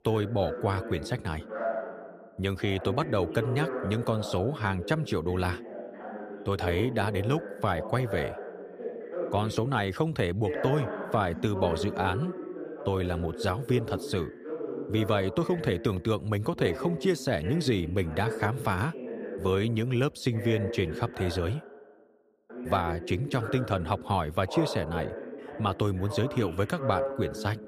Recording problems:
voice in the background; loud; throughout; 8 dB below the speech

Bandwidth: 15 kHz